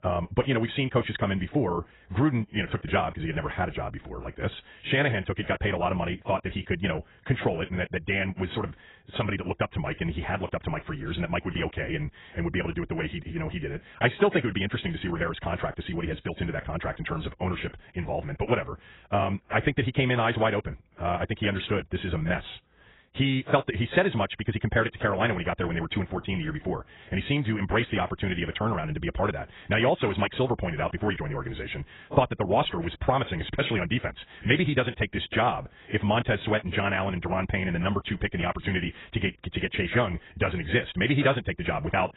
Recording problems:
garbled, watery; badly; nothing above 4 kHz
wrong speed, natural pitch; too fast; 1.6 times normal speed

